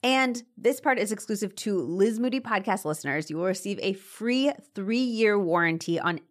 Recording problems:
none

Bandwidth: 14.5 kHz